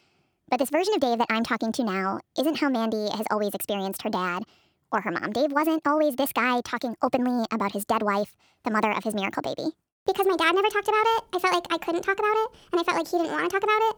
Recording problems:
wrong speed and pitch; too fast and too high; 1.5 times normal speed

